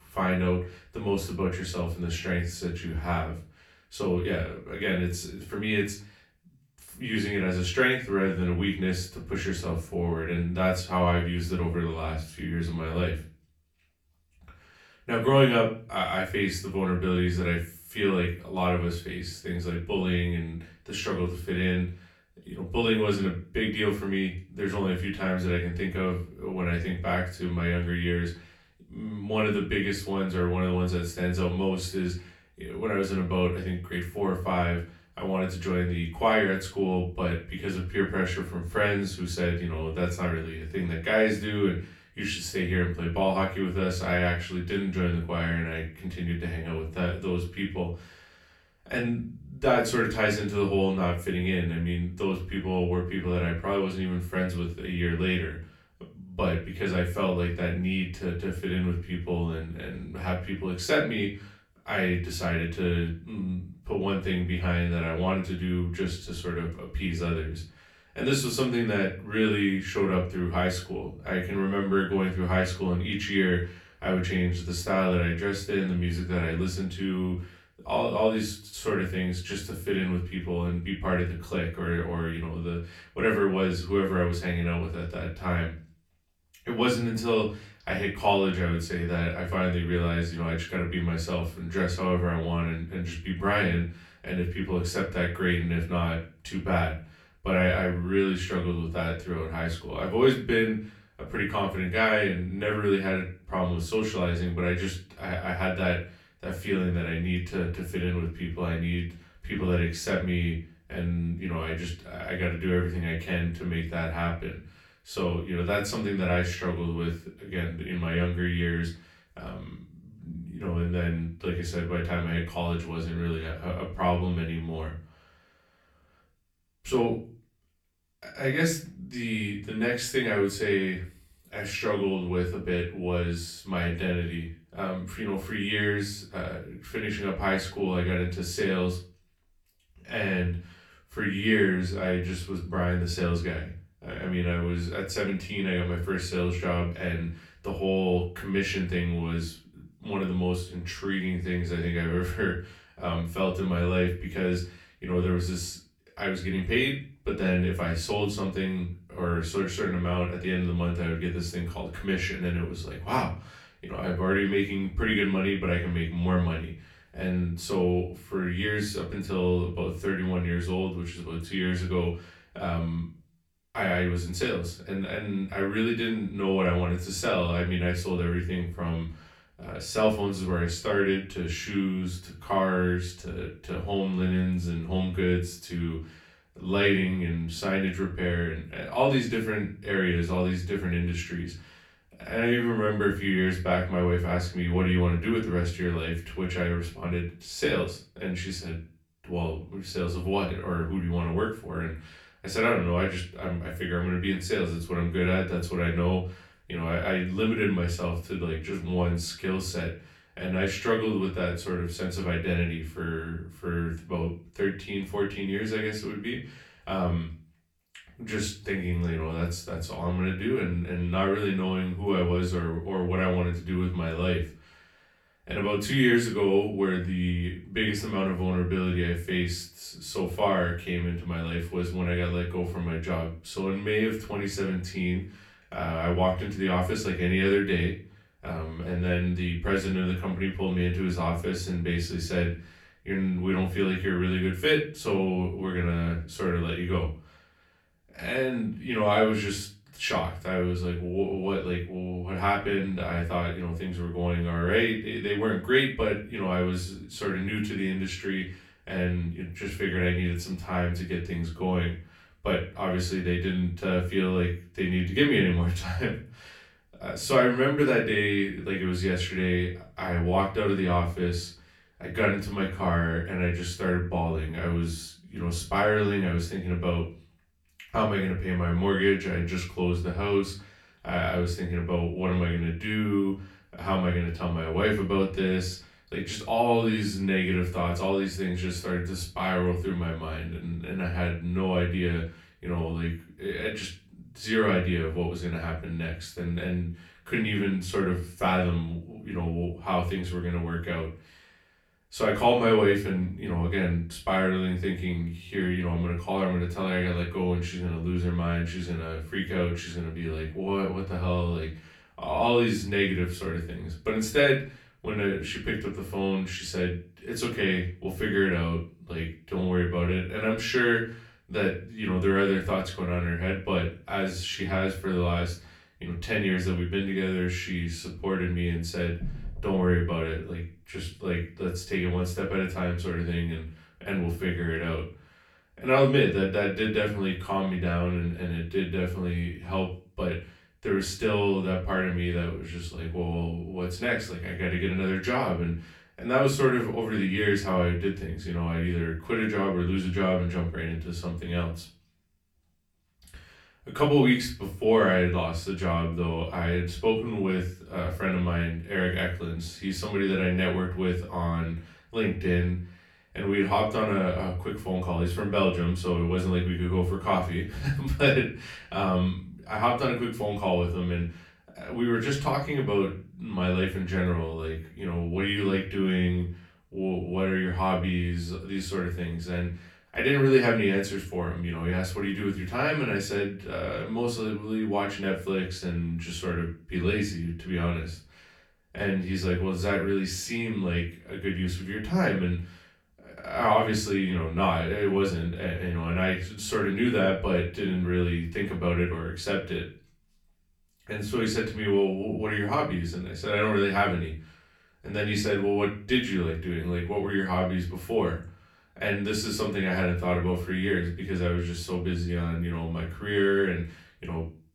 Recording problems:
off-mic speech; far
room echo; slight; dies away in 0.3 s

